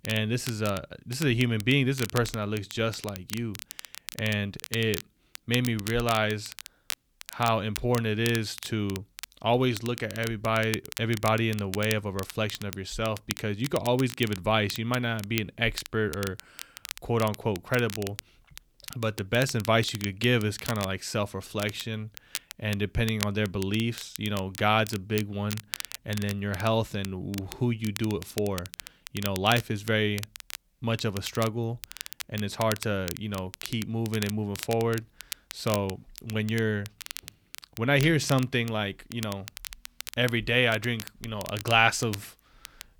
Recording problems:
crackle, like an old record; noticeable; 10 dB below the speech

